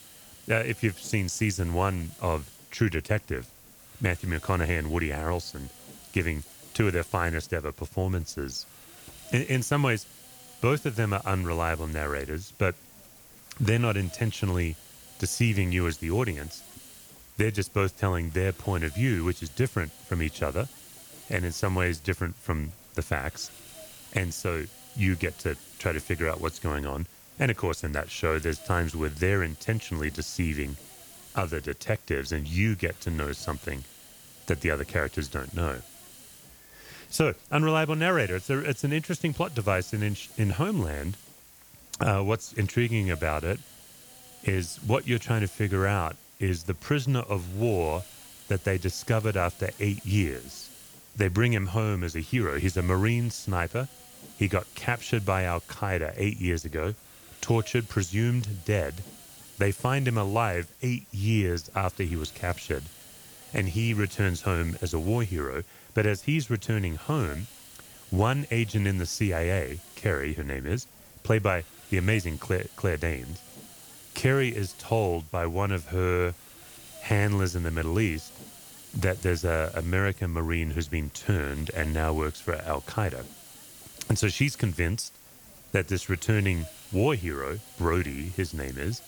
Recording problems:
hiss; noticeable; throughout; 20 dB below the speech

